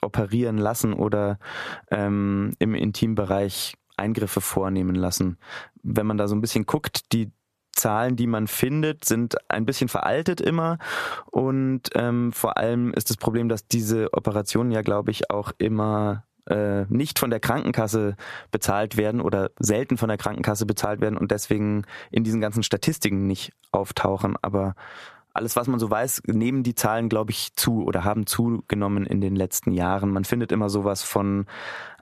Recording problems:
squashed, flat; somewhat

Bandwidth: 14.5 kHz